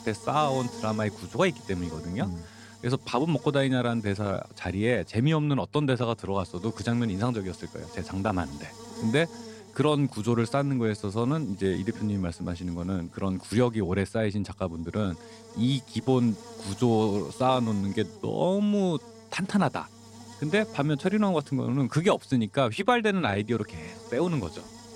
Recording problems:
electrical hum; noticeable; throughout; 50 Hz, 20 dB below the speech

